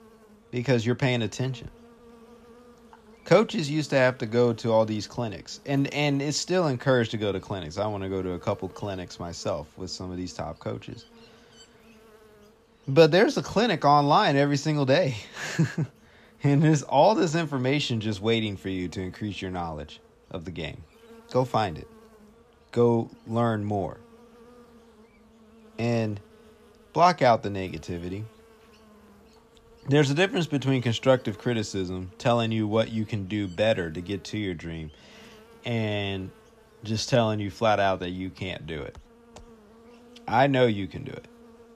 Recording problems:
electrical hum; faint; throughout; 50 Hz, 30 dB below the speech

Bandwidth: 14.5 kHz